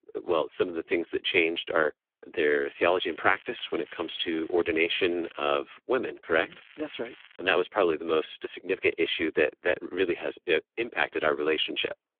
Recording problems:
phone-call audio; poor line; nothing above 3.5 kHz
crackling; faint; from 3 to 5.5 s and at 6.5 s; 25 dB below the speech

